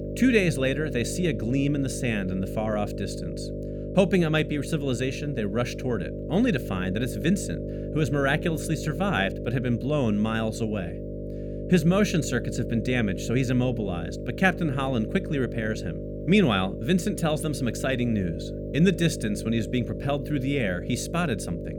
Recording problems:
electrical hum; loud; throughout; 50 Hz, 9 dB below the speech

